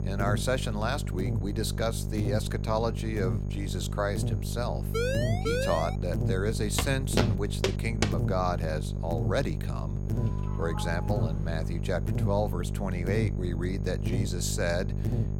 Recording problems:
electrical hum; loud; throughout; 50 Hz, 9 dB below the speech
high-pitched whine; faint; throughout; 6.5 kHz, 35 dB below the speech
siren; loud; from 5 to 6 s; peak 2 dB above the speech
footsteps; loud; from 7 to 8 s; peak 2 dB above the speech
doorbell; noticeable; from 10 to 12 s; peak 9 dB below the speech

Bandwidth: 16.5 kHz